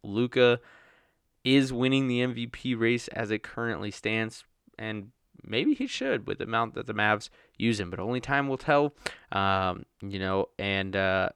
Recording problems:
none

